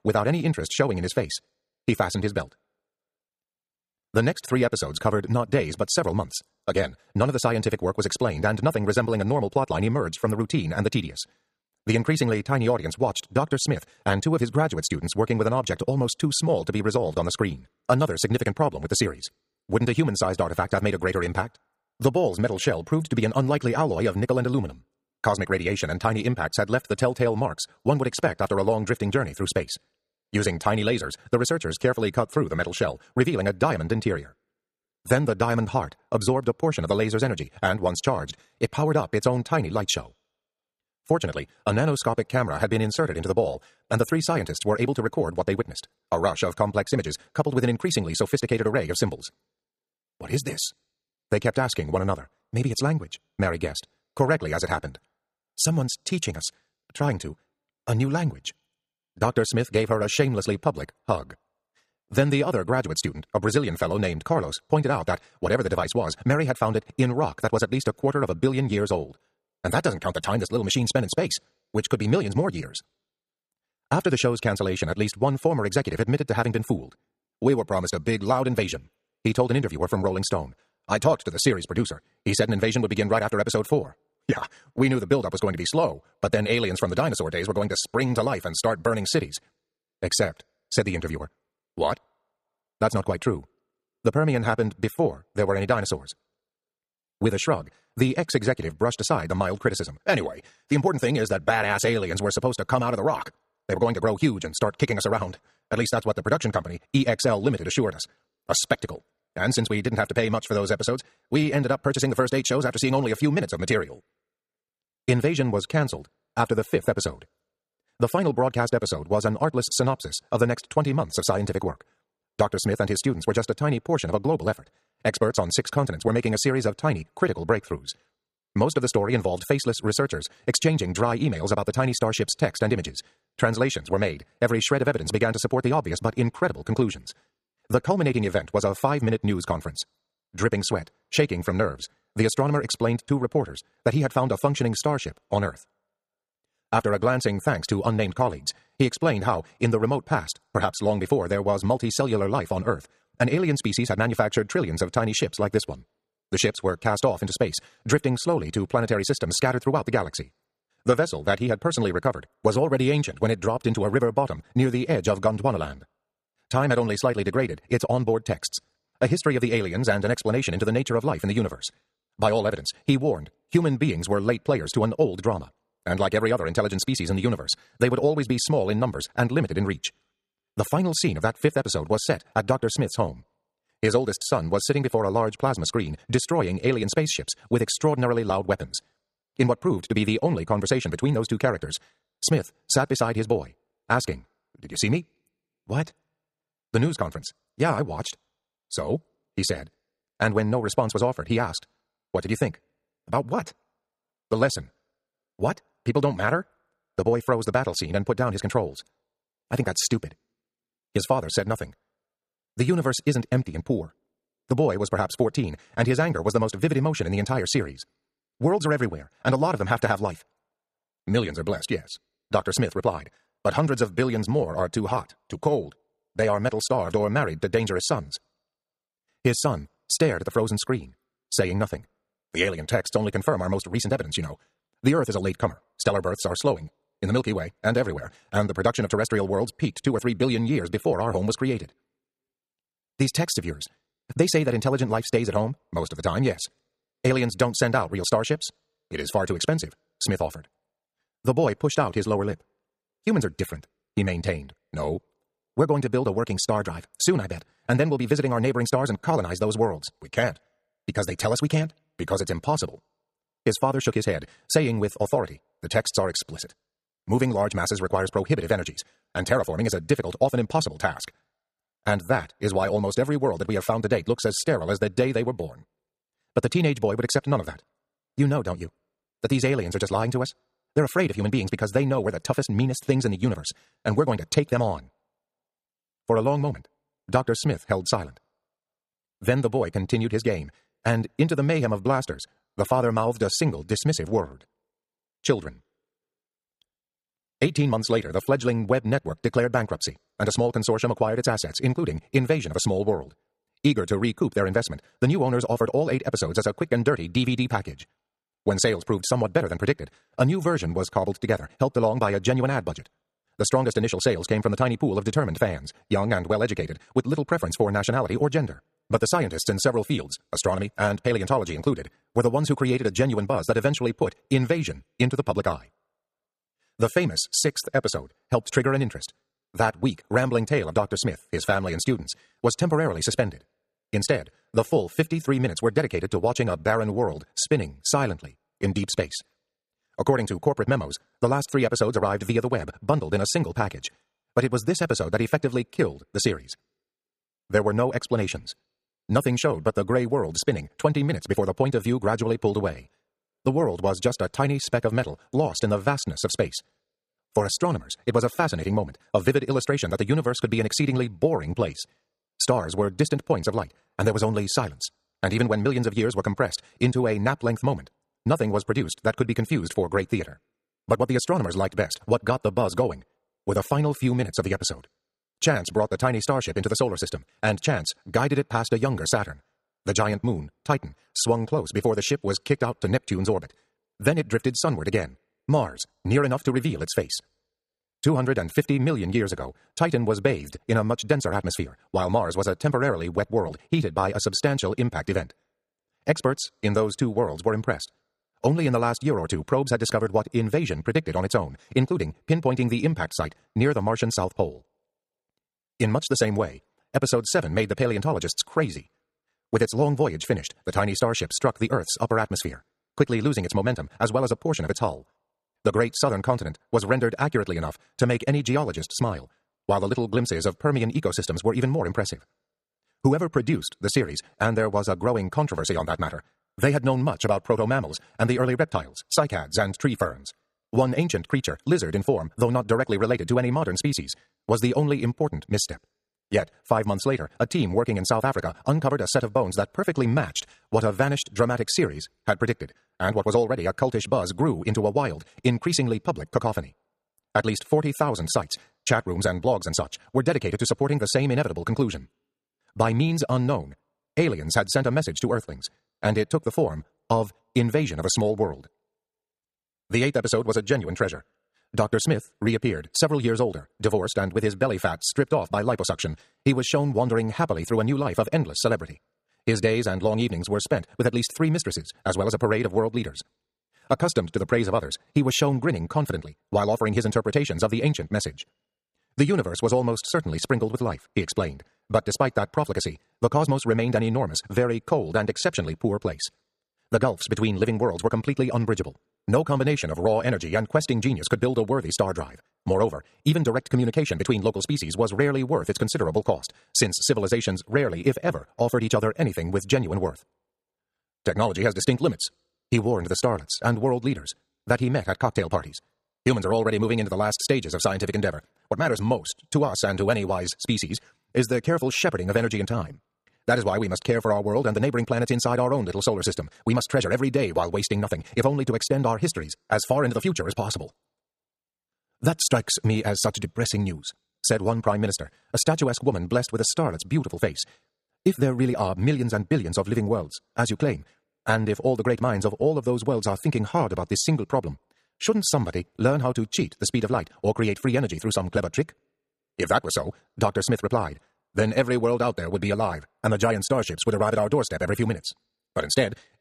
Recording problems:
wrong speed, natural pitch; too fast; 1.6 times normal speed

